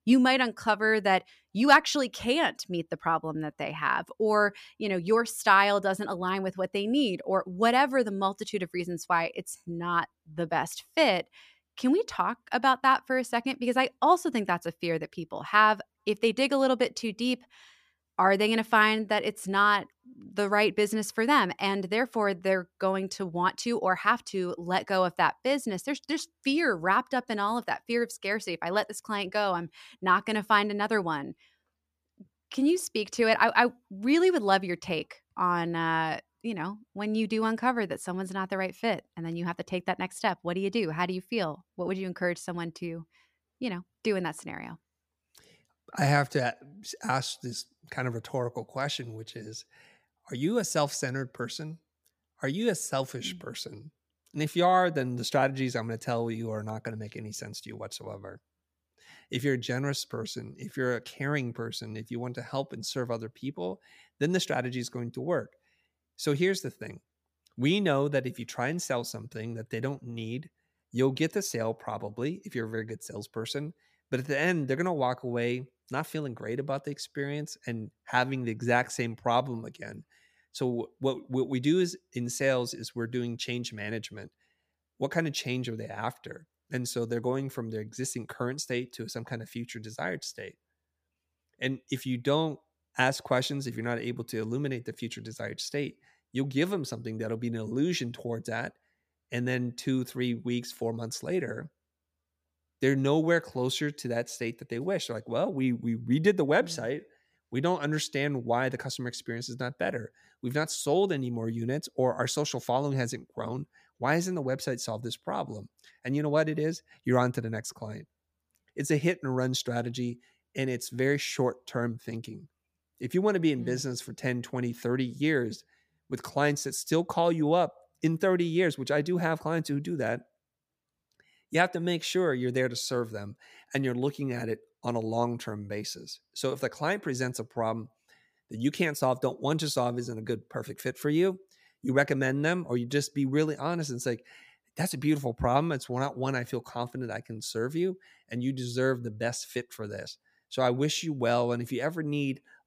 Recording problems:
none

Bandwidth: 15 kHz